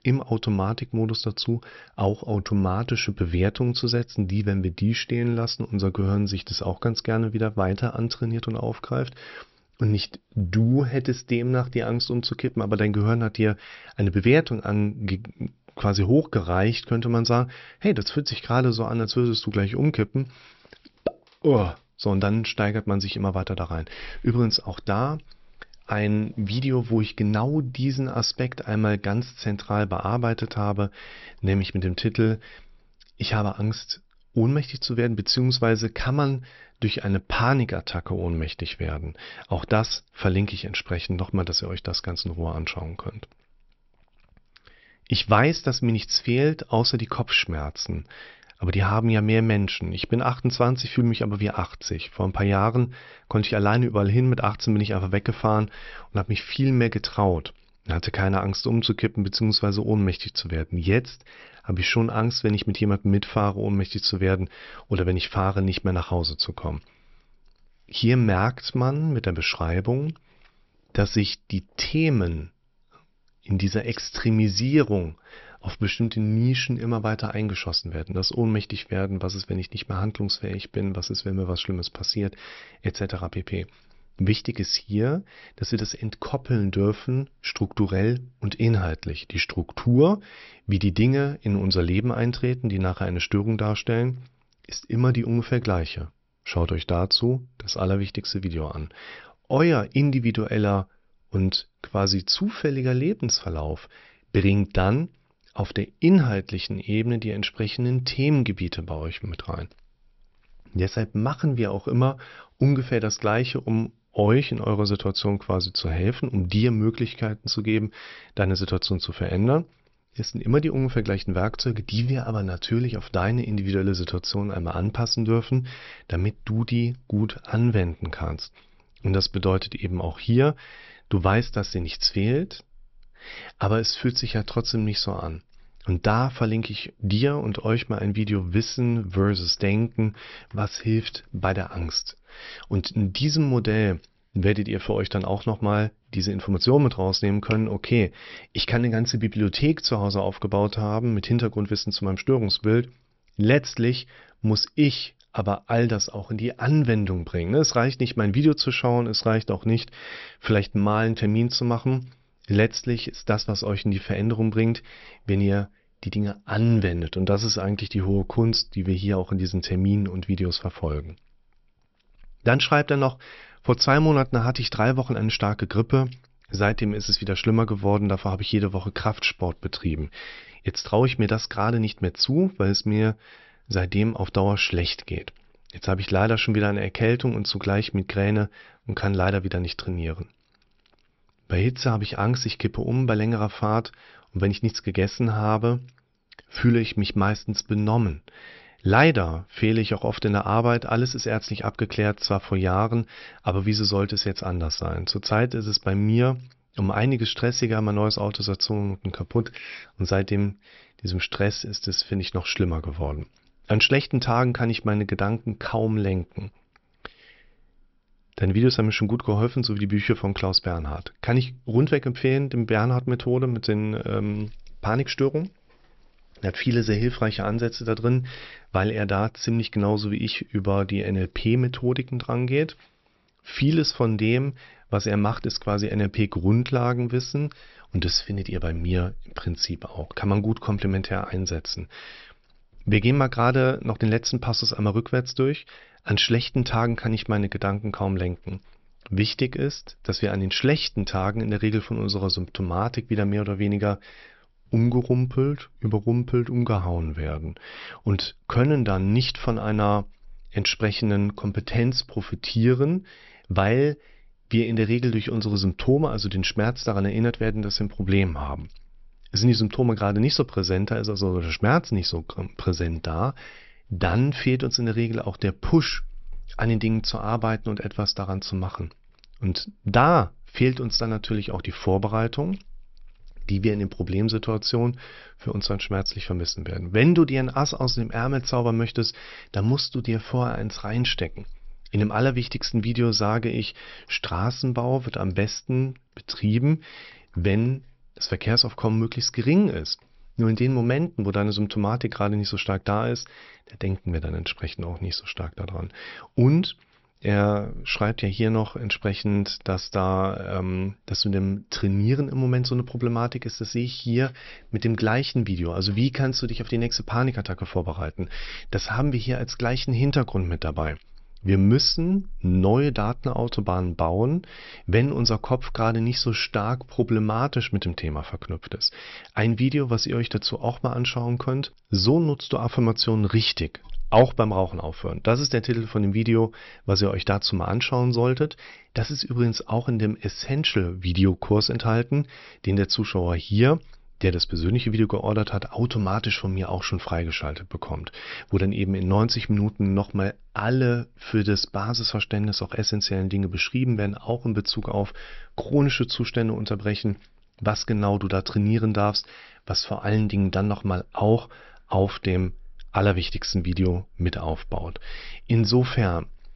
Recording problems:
high frequencies cut off; noticeable; nothing above 5.5 kHz

